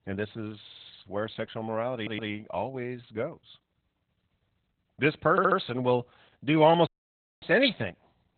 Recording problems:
garbled, watery; badly; nothing above 4 kHz
audio stuttering; at 0.5 s, at 2 s and at 5.5 s
audio cutting out; at 7 s for 0.5 s

